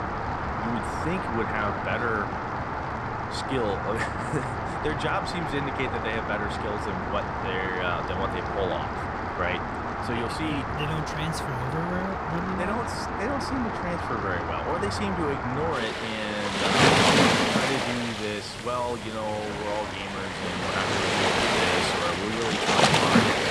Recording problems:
rain or running water; very loud; throughout; 4 dB above the speech

